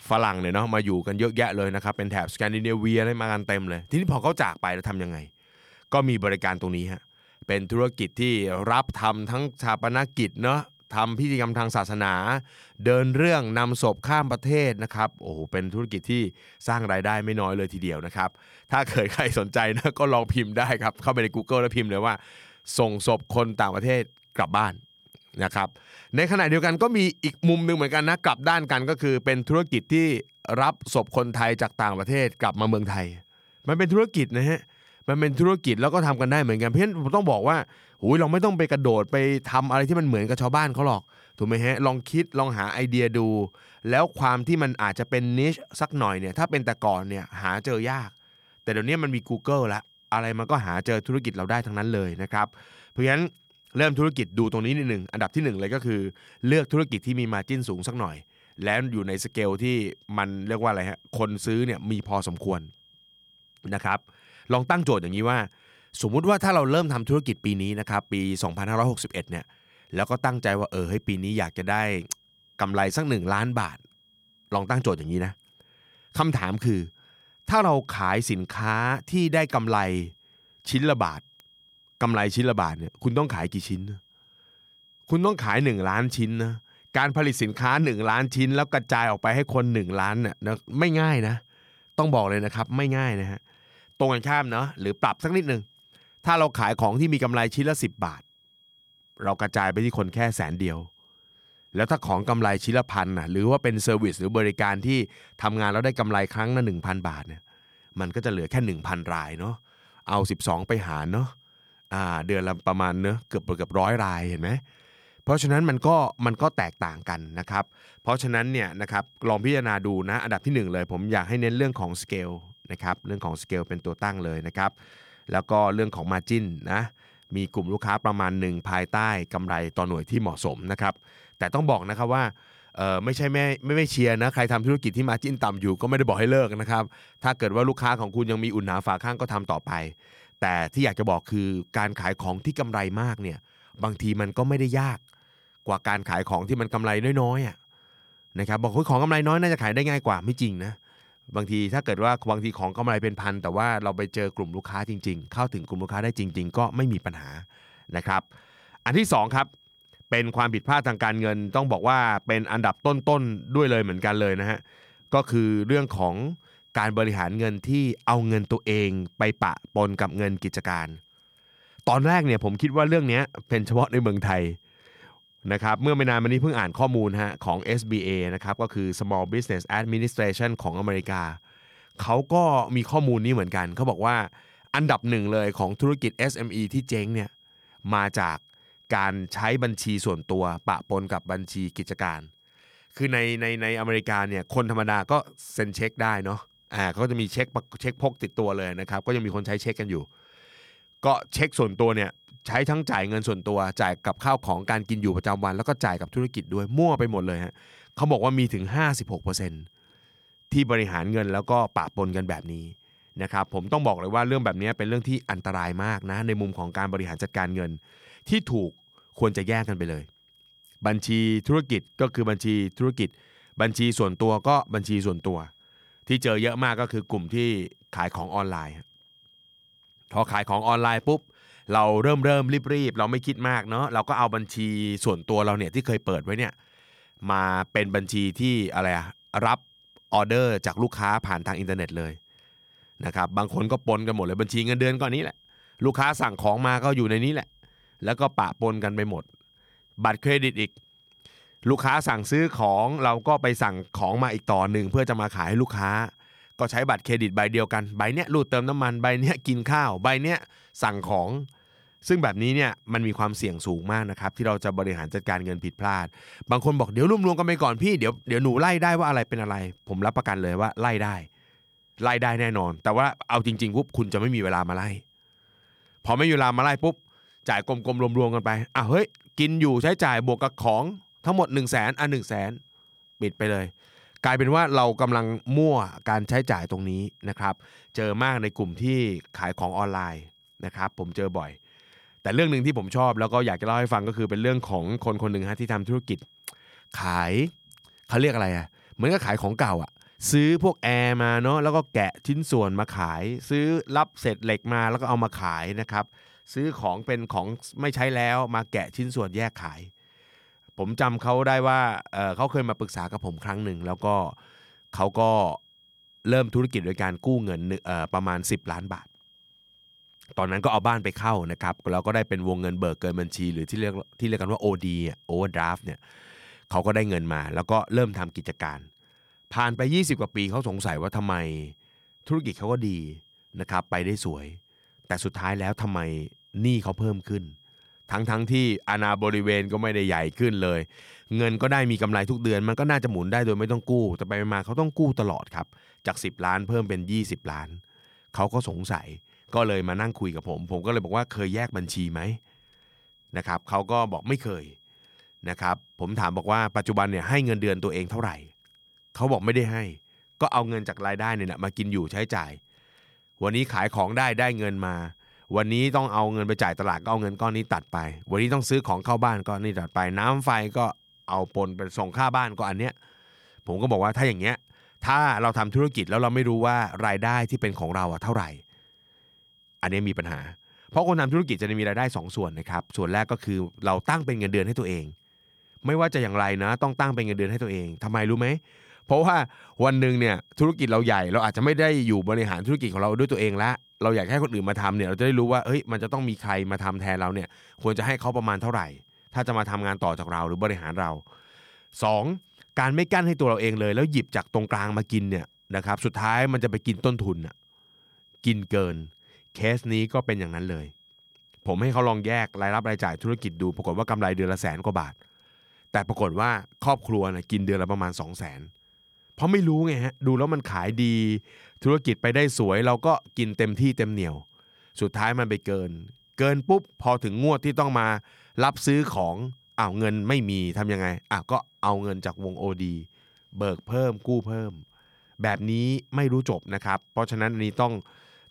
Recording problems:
high-pitched whine; faint; throughout; 3 kHz, 30 dB below the speech

